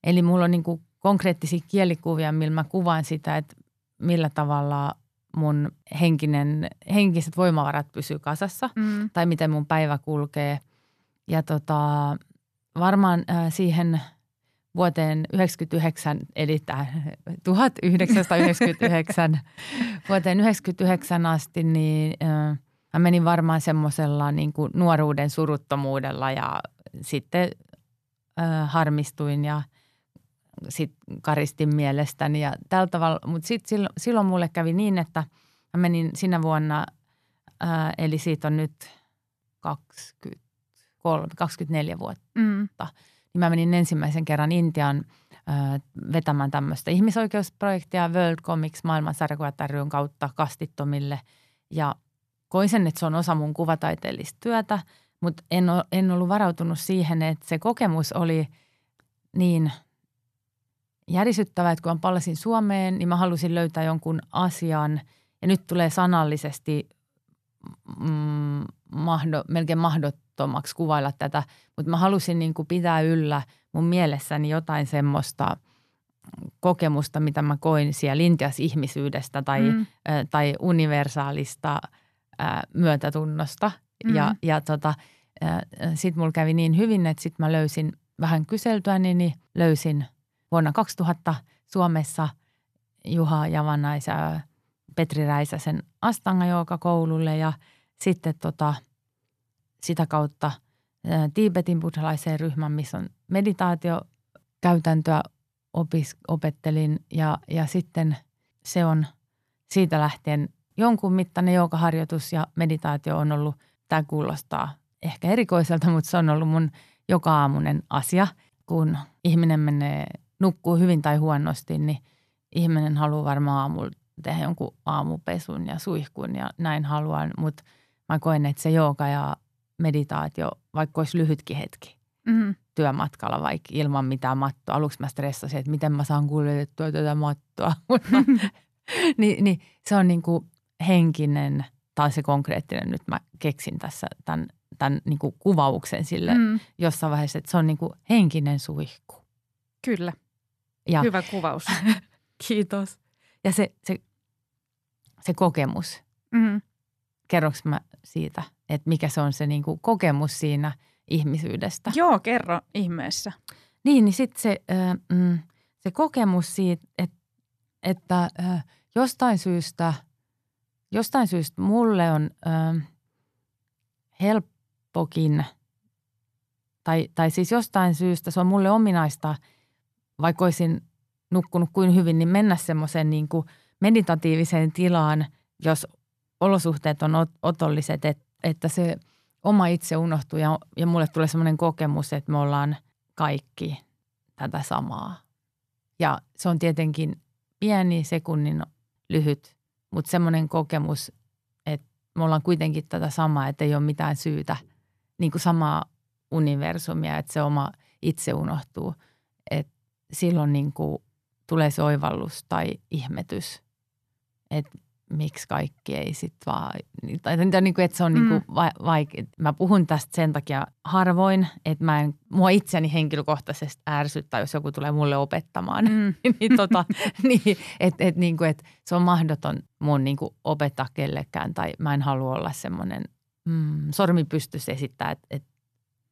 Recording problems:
none

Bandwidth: 14 kHz